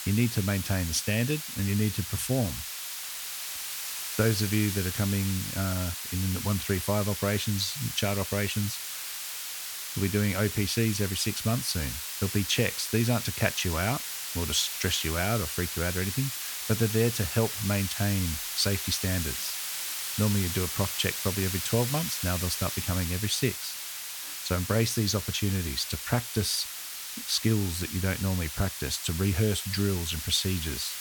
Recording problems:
hiss; loud; throughout; 4 dB below the speech

